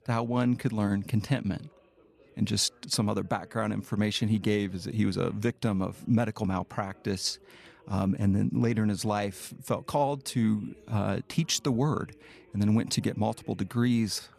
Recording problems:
background chatter; faint; throughout; 4 voices, 30 dB below the speech

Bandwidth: 14 kHz